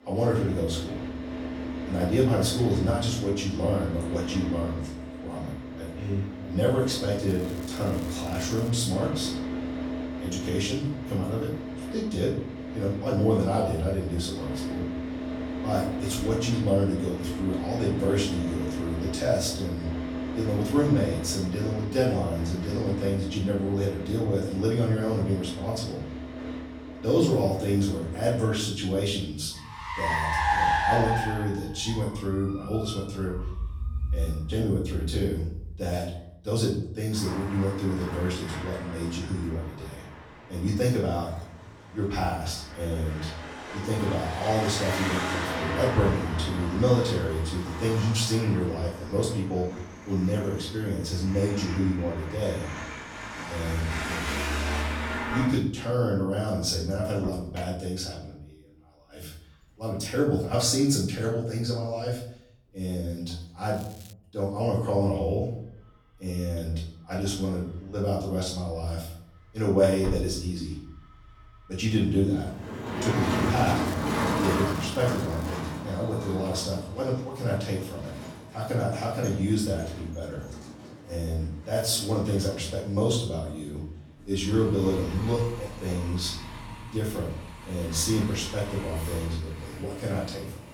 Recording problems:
off-mic speech; far
room echo; noticeable; dies away in 0.5 s
traffic noise; loud; throughout; 6 dB below the speech
crackling; faint; from 7.5 to 8.5 s, at 1:04 and from 1:14 to 1:16; 20 dB below the speech

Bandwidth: 18 kHz